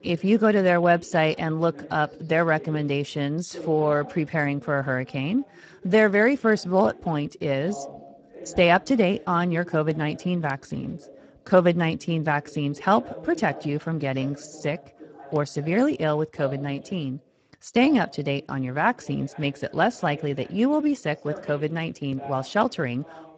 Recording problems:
garbled, watery; badly; nothing above 7.5 kHz
voice in the background; noticeable; throughout; 20 dB below the speech

